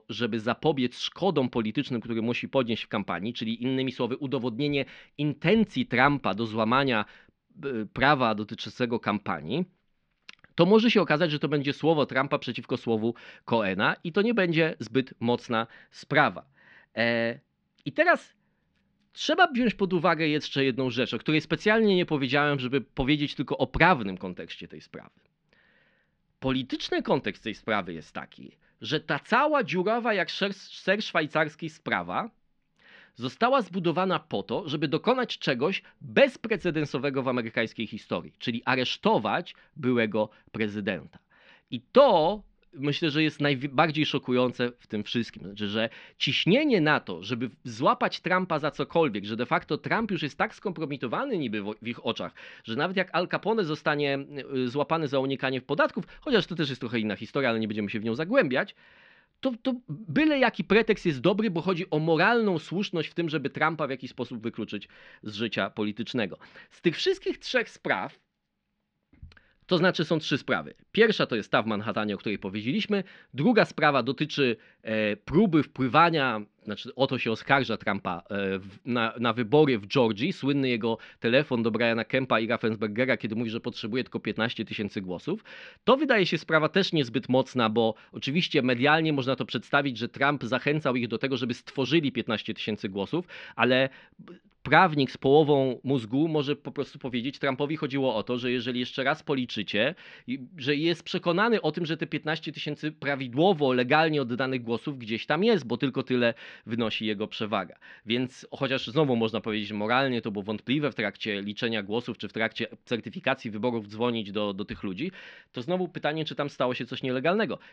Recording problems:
muffled; very slightly; fading above 4.5 kHz

